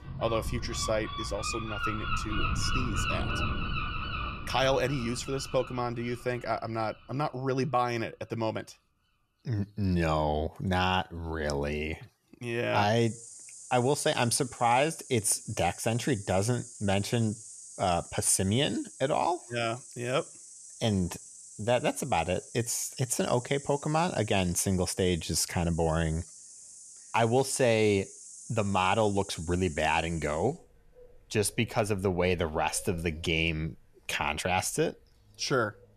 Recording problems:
animal sounds; noticeable; throughout; 10 dB below the speech

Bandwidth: 13.5 kHz